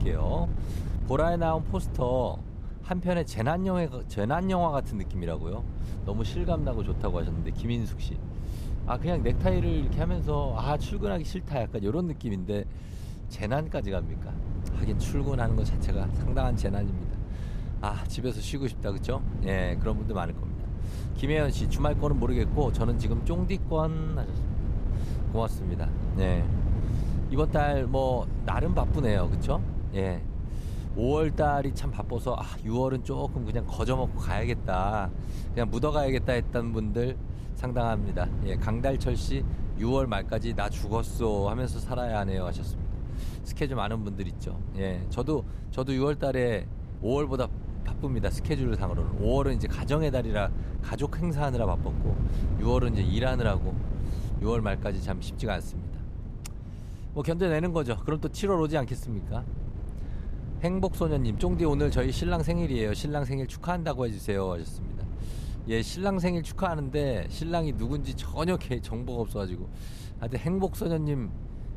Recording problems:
wind noise on the microphone; occasional gusts; 15 dB below the speech

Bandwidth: 14.5 kHz